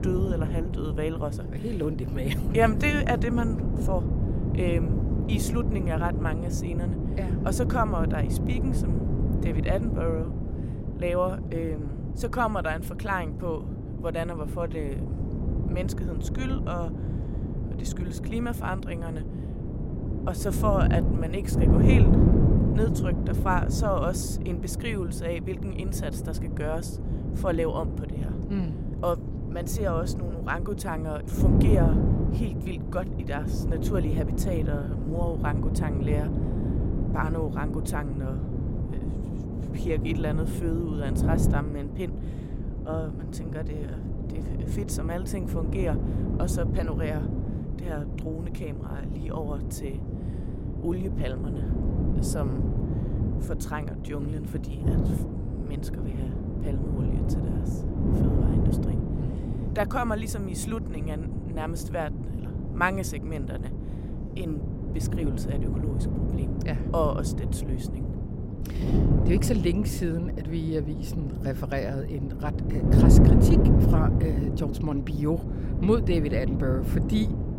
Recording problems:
wind noise on the microphone; heavy; 4 dB below the speech

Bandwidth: 16 kHz